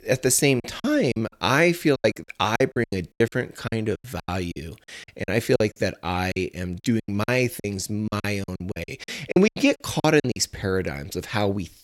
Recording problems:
choppy; very; 15% of the speech affected

